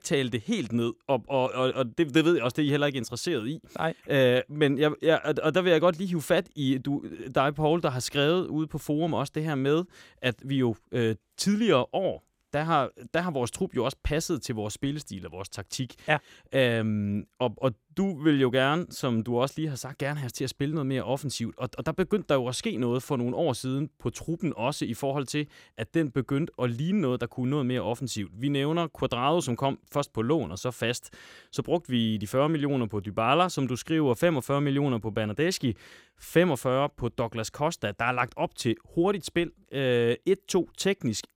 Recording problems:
none

